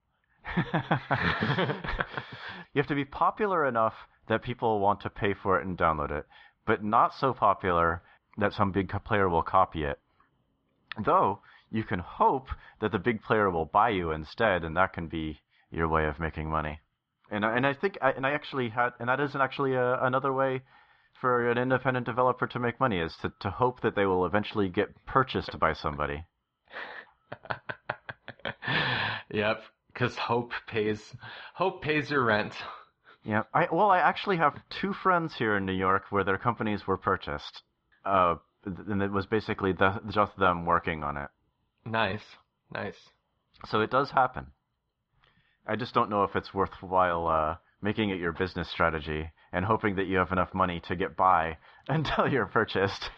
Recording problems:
muffled; very; fading above 4 kHz

